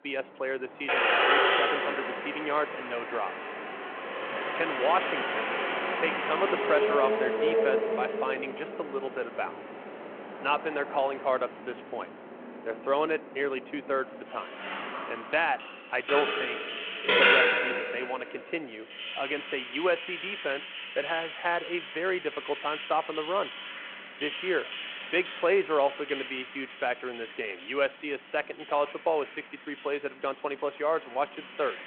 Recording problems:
phone-call audio
traffic noise; very loud; throughout; 1 dB above the speech

